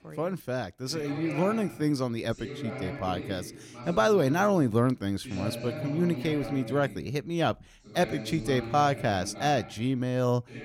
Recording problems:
voice in the background; noticeable; throughout; 10 dB below the speech

